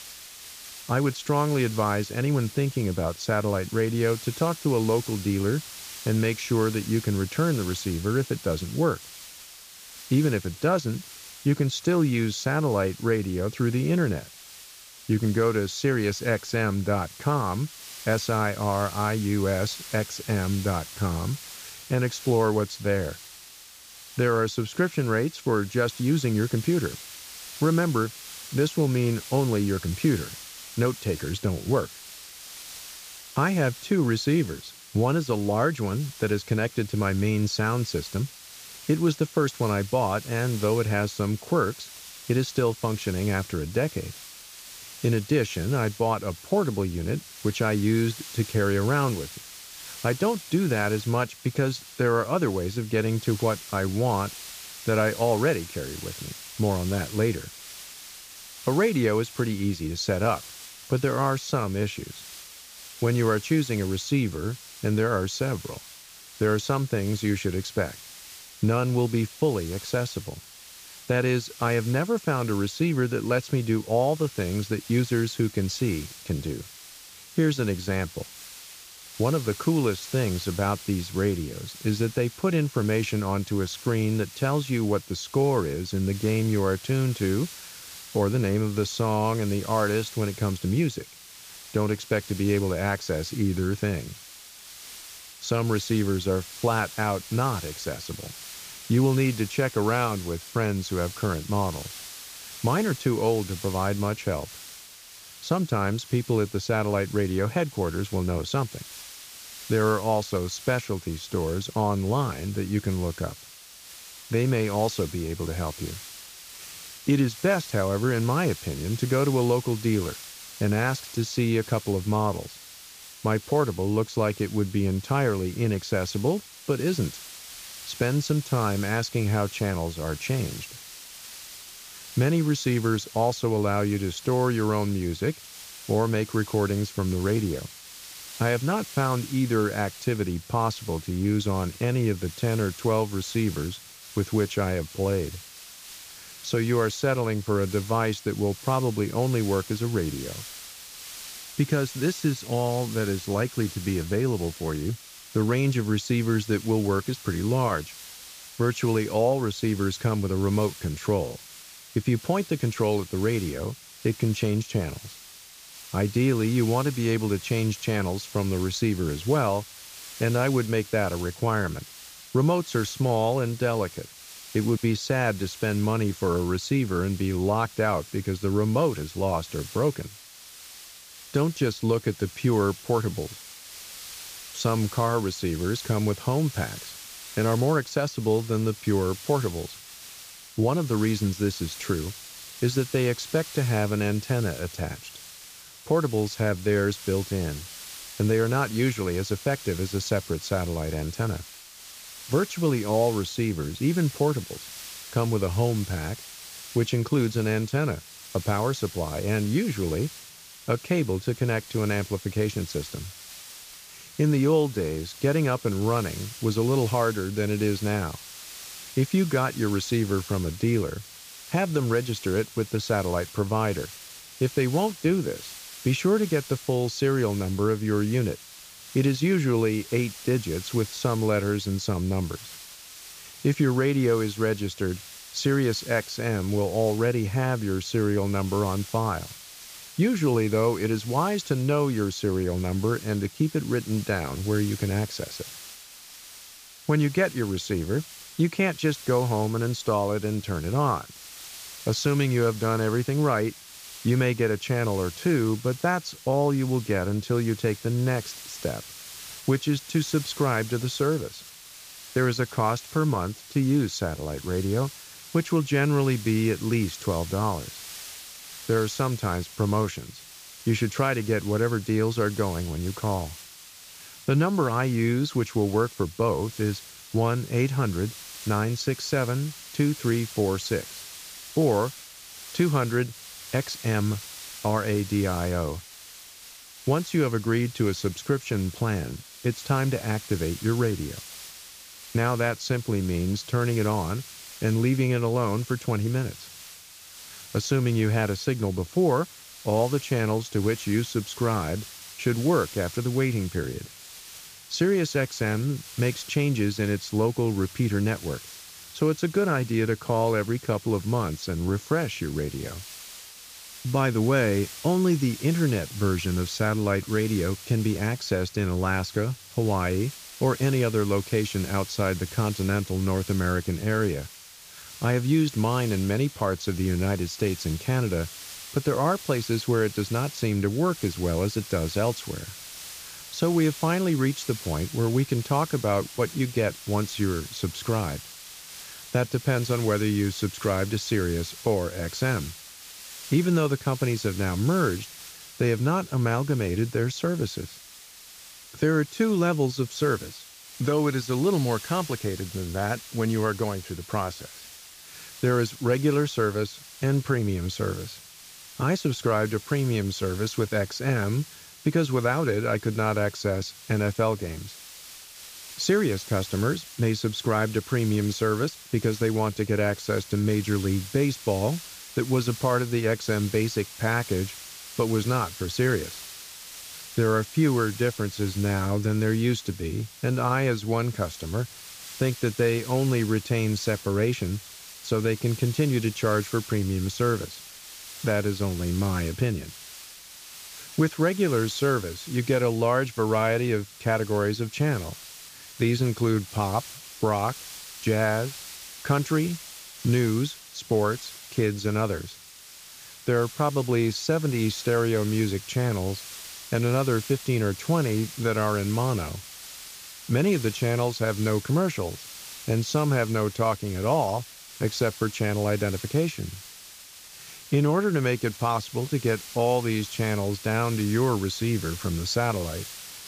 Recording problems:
high frequencies cut off; noticeable; nothing above 8 kHz
hiss; noticeable; throughout; 15 dB below the speech

